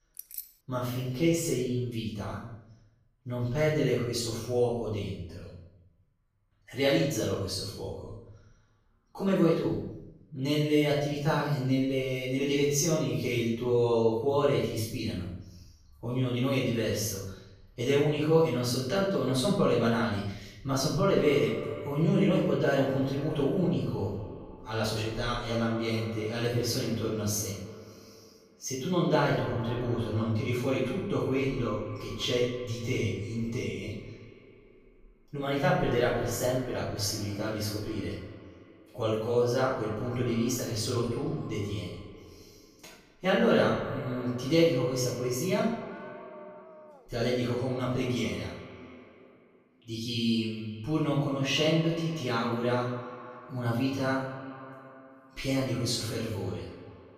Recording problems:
off-mic speech; far
echo of what is said; noticeable; from 21 s on; 210 ms later, 15 dB below the speech
room echo; noticeable; dies away in 0.7 s
jangling keys; faint; at the start; peak 10 dB below the speech
dog barking; faint; from 46 to 47 s; peak 20 dB below the speech

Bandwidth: 15 kHz